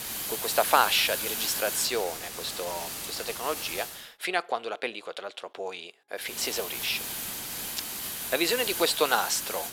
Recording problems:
thin; very; fading below 550 Hz
hiss; loud; until 4 s and from 6.5 s on; 3 dB below the speech

